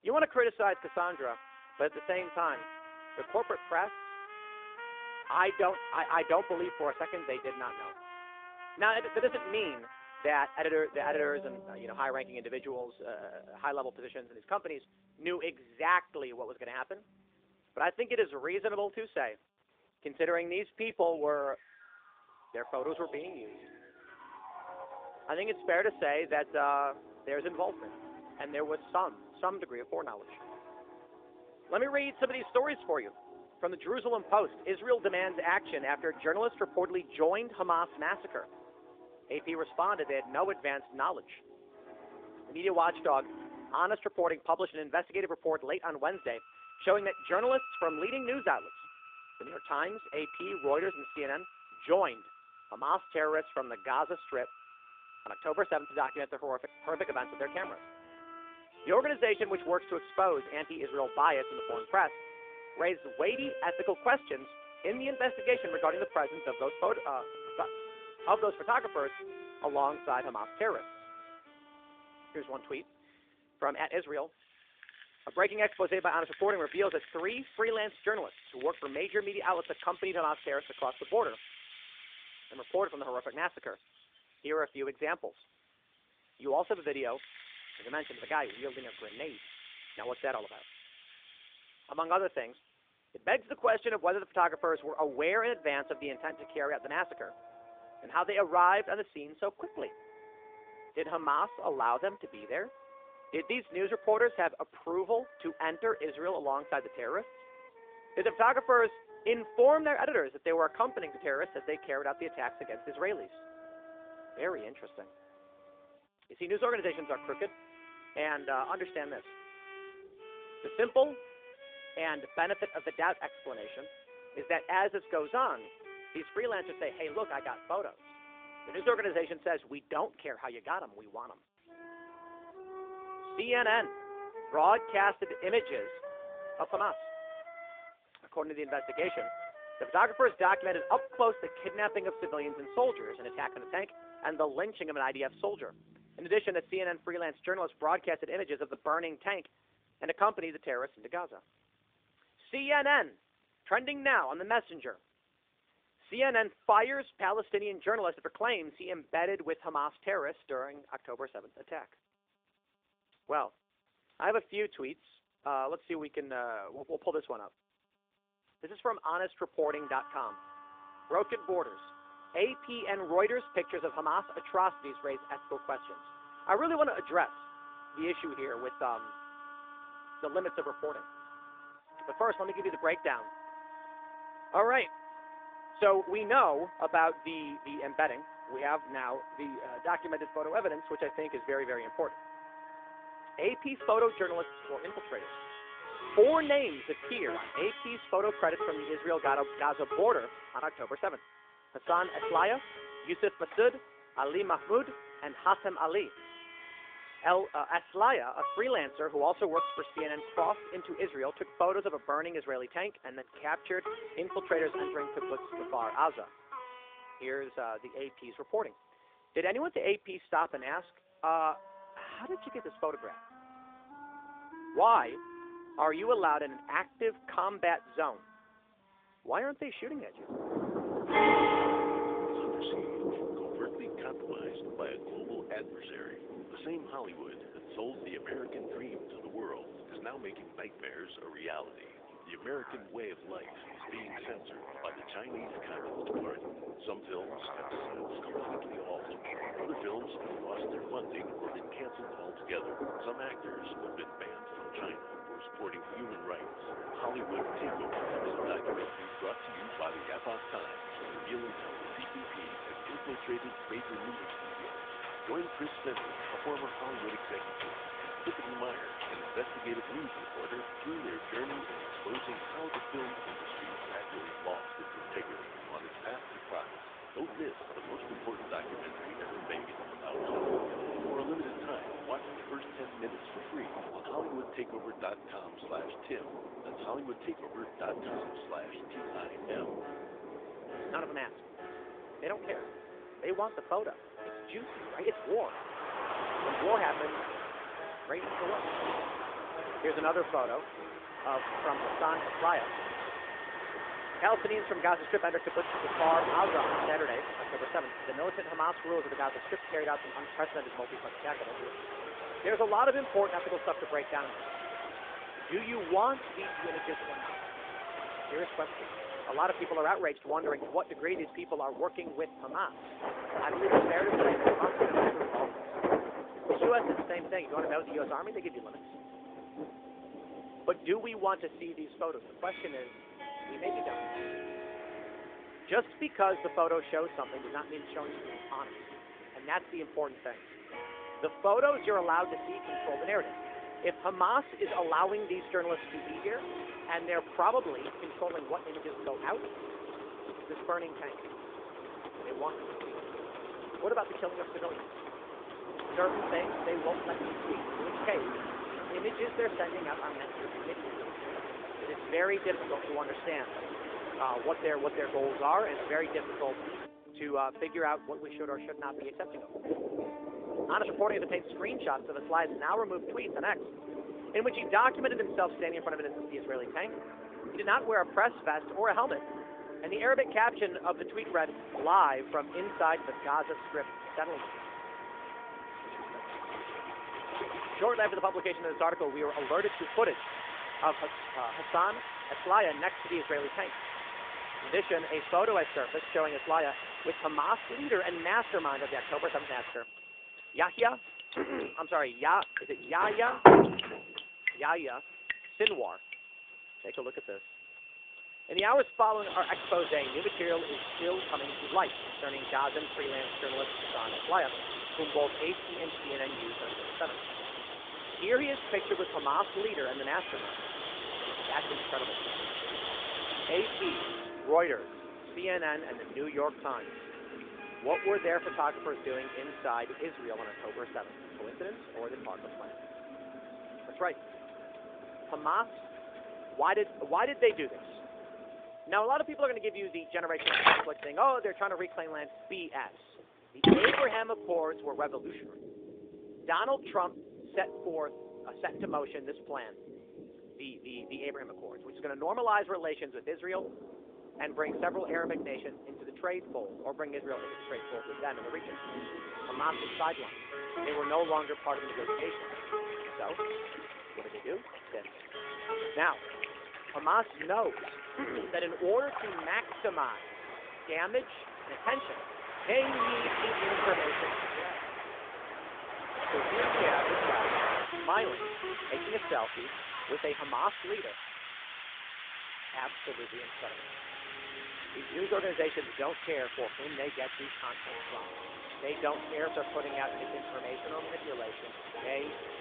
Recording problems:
phone-call audio; nothing above 3 kHz
rain or running water; loud; from 3:50 on; 5 dB below the speech
background music; noticeable; throughout; 10 dB below the speech

